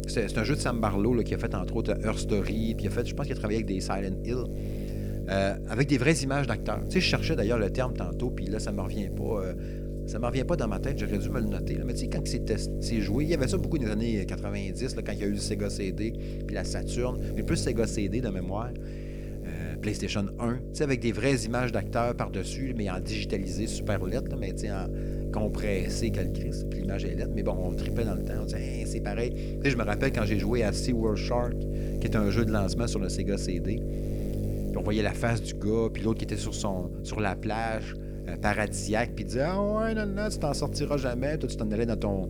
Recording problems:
electrical hum; loud; throughout; 50 Hz, 8 dB below the speech

